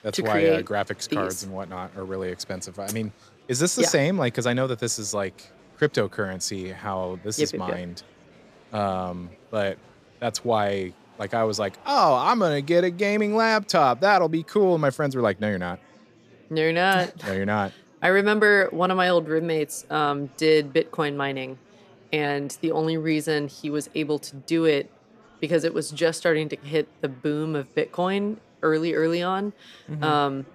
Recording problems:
murmuring crowd; faint; throughout; 30 dB below the speech

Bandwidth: 14.5 kHz